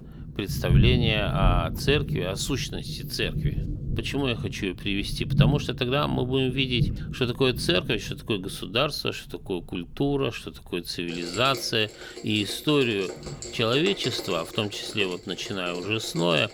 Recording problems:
rain or running water; loud; throughout; 4 dB below the speech

